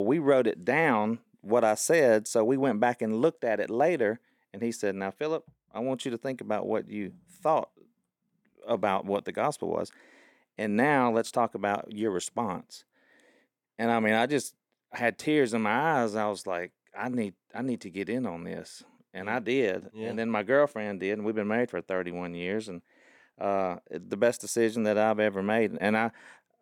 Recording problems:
abrupt cut into speech; at the start

